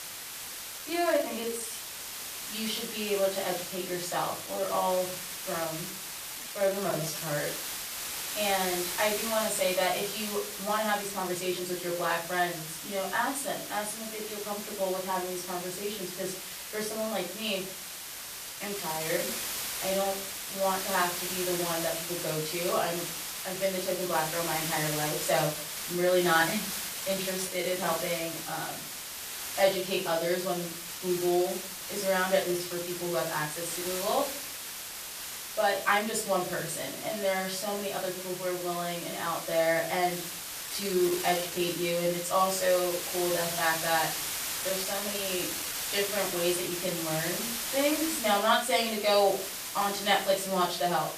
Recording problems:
off-mic speech; far
room echo; slight; dies away in 0.4 s
hiss; loud; throughout; 4 dB below the speech
uneven, jittery; strongly; from 1 to 46 s

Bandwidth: 14.5 kHz